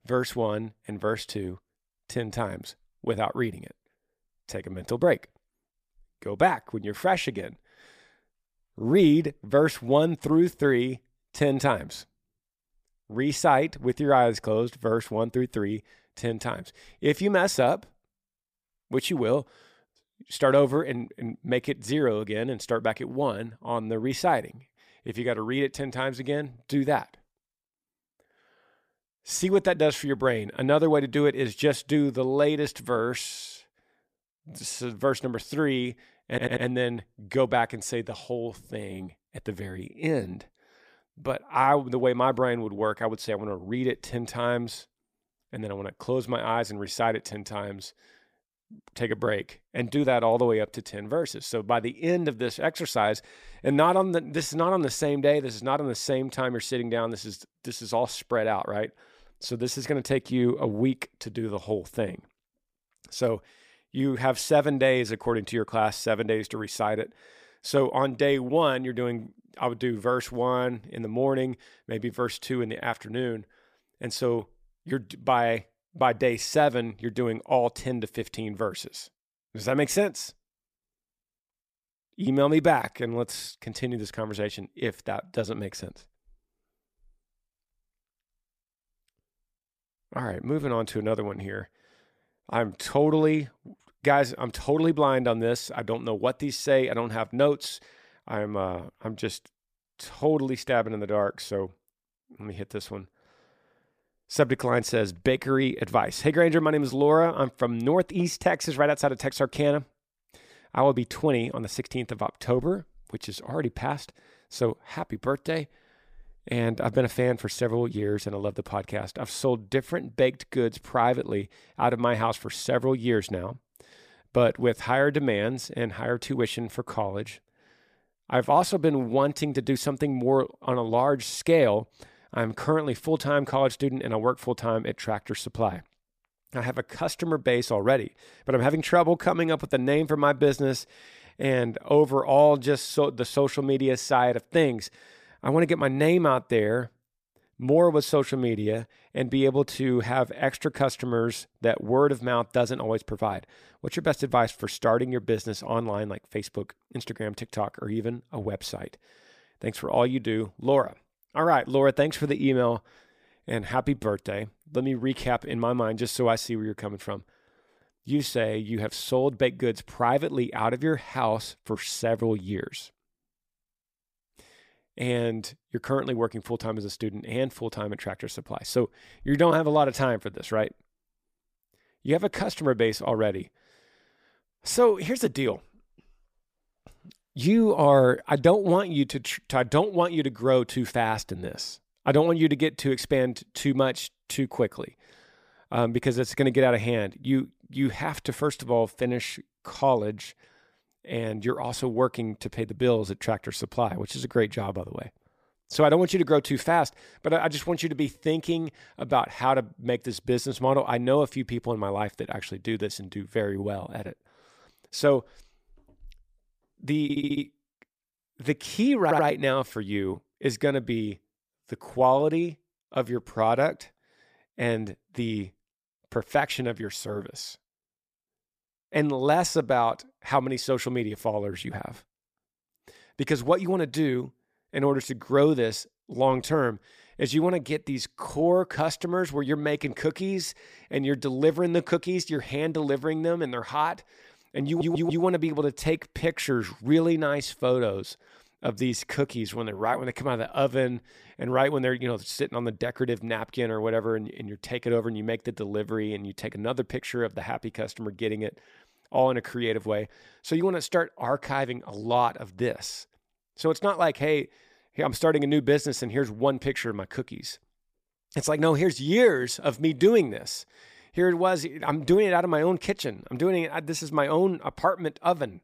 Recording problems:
audio stuttering; 4 times, first at 36 s

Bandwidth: 15 kHz